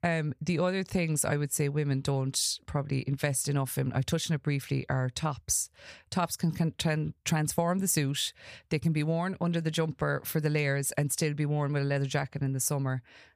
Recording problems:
none

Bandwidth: 15 kHz